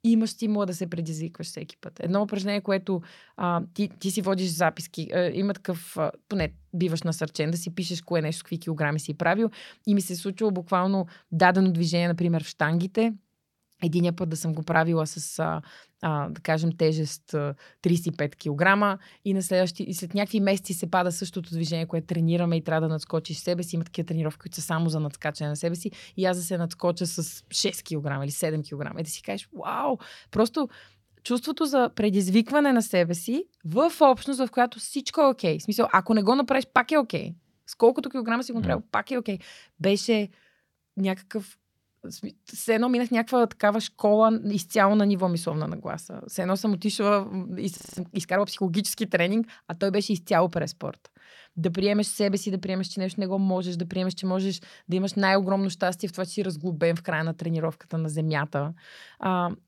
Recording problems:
audio freezing; at 48 s

